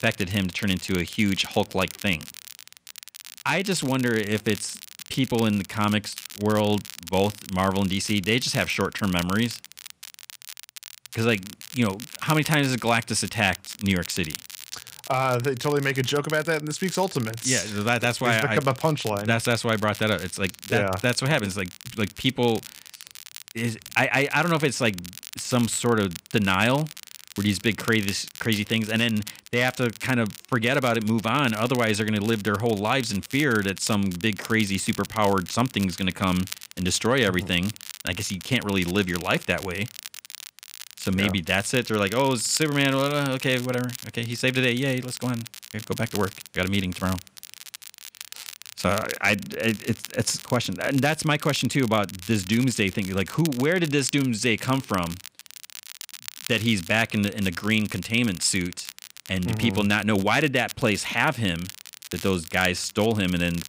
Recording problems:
crackle, like an old record; noticeable; 15 dB below the speech

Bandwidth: 15.5 kHz